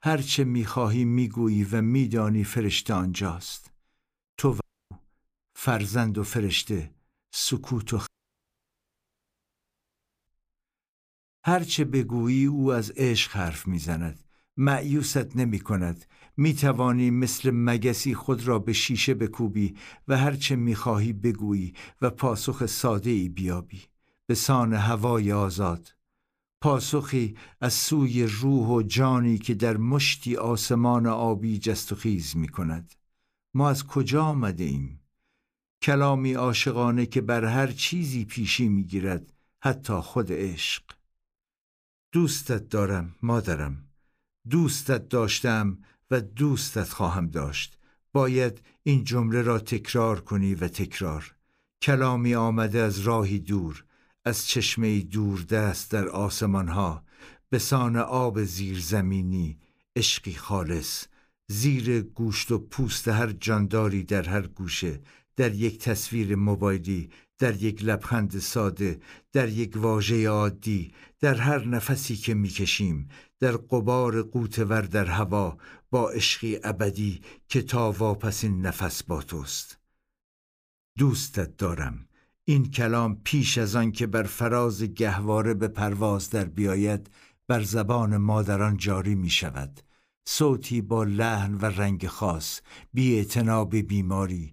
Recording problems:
audio cutting out; at 4.5 s and at 8 s for 2 s

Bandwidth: 15 kHz